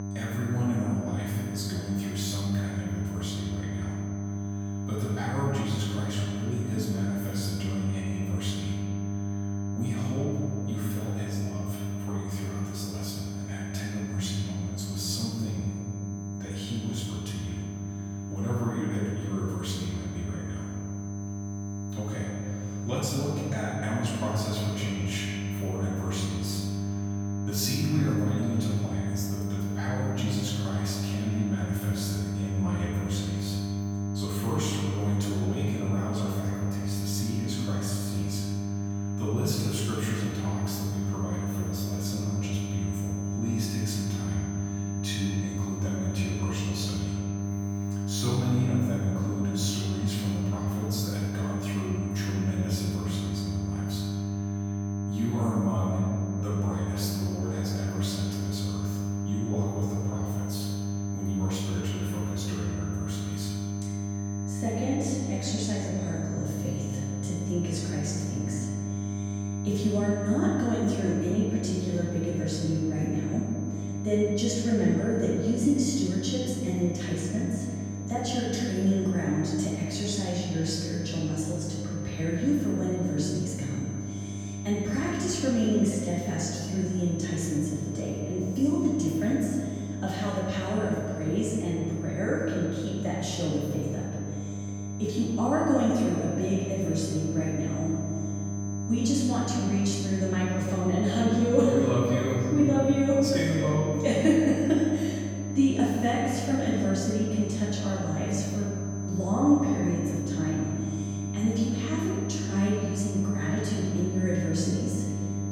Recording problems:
room echo; strong; dies away in 2 s
off-mic speech; far
electrical hum; loud; throughout; 50 Hz, 8 dB below the speech
high-pitched whine; noticeable; throughout; 6 kHz, 15 dB below the speech

